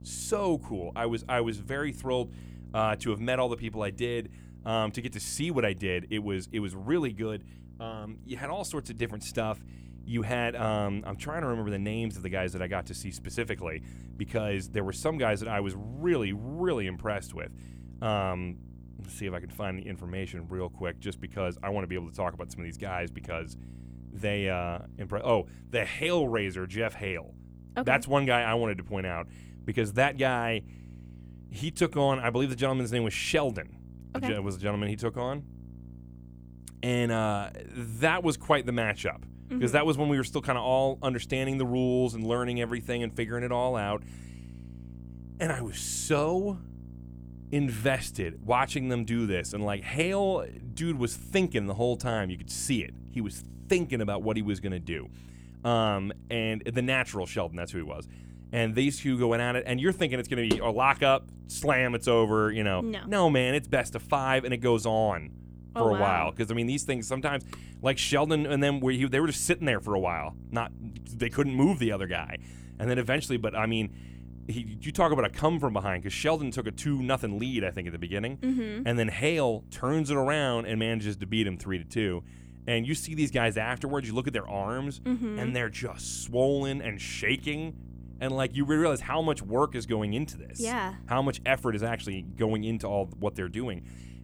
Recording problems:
electrical hum; faint; throughout; 60 Hz, 25 dB below the speech

